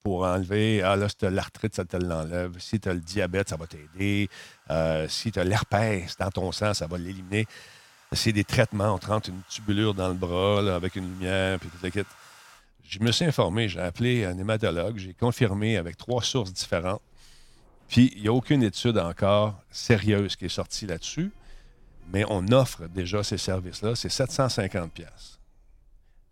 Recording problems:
household noises; faint; throughout; 30 dB below the speech

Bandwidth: 16.5 kHz